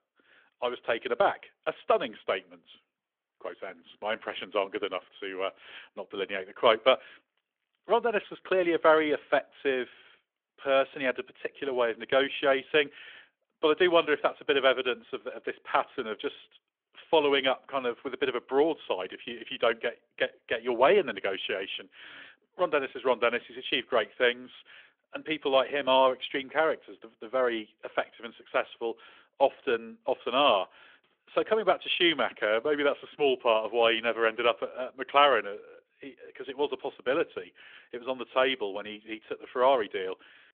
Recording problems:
phone-call audio; nothing above 3.5 kHz

